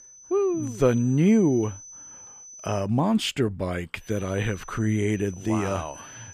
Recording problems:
high-pitched whine; noticeable; until 3 s and from 4 s on; 6 kHz, 20 dB below the speech

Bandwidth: 15 kHz